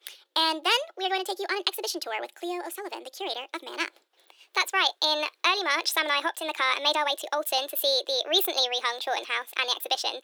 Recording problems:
thin; very; fading below 350 Hz
wrong speed and pitch; too fast and too high; 1.5 times normal speed

